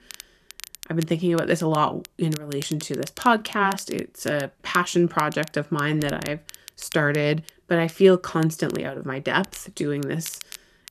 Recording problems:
crackle, like an old record; noticeable; 15 dB below the speech

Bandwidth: 13.5 kHz